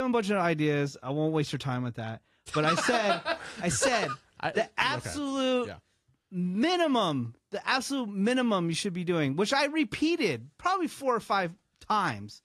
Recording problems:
garbled, watery; slightly
abrupt cut into speech; at the start

